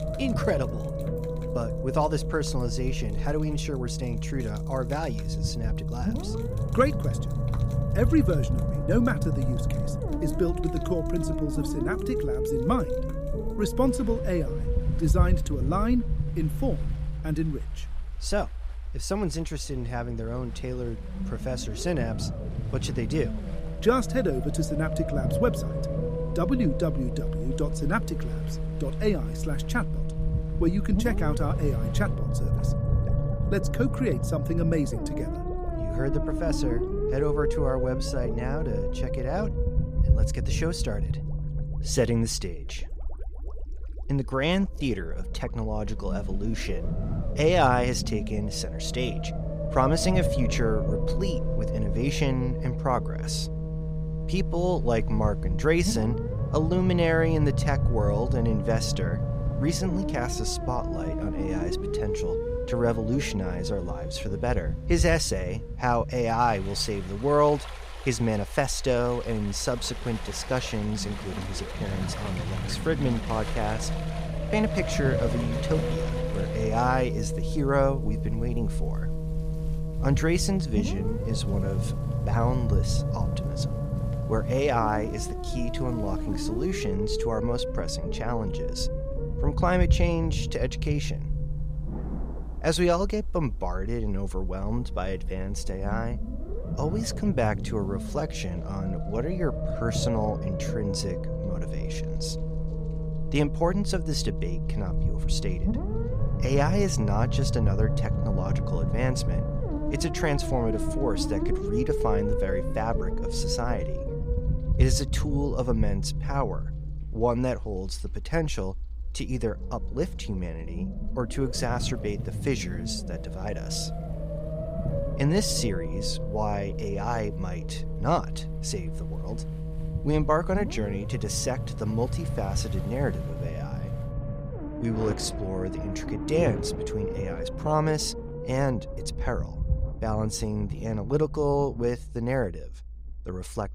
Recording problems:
low rumble; loud; throughout; 6 dB below the speech
rain or running water; noticeable; throughout; 15 dB below the speech

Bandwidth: 15.5 kHz